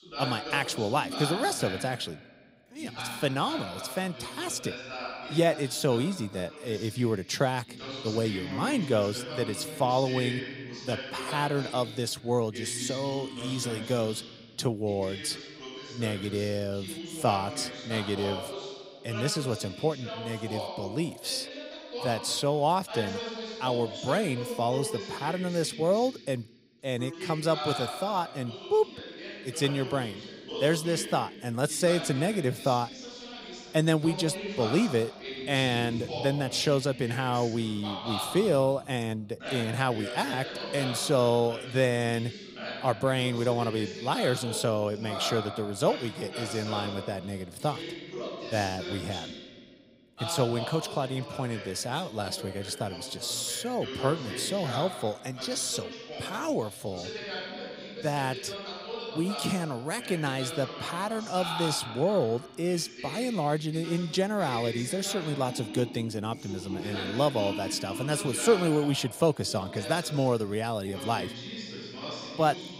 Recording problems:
voice in the background; loud; throughout; 8 dB below the speech

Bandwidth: 15.5 kHz